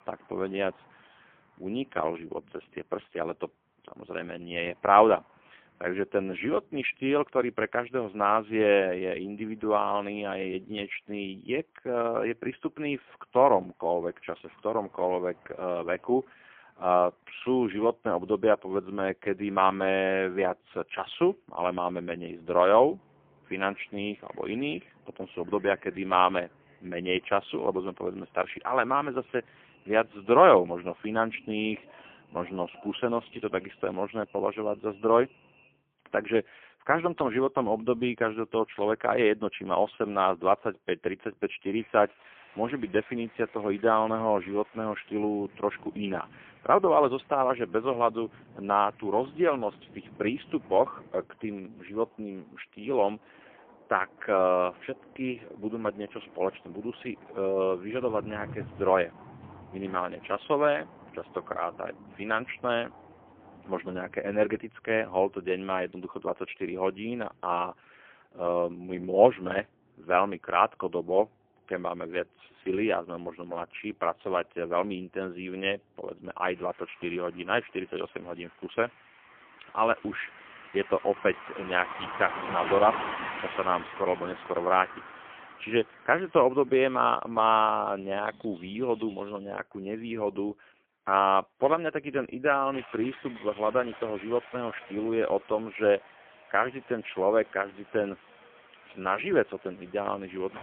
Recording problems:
phone-call audio; poor line; nothing above 3.5 kHz
traffic noise; noticeable; throughout; 15 dB below the speech

